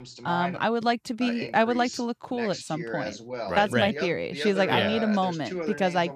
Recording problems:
voice in the background; loud; throughout; 9 dB below the speech

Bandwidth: 14.5 kHz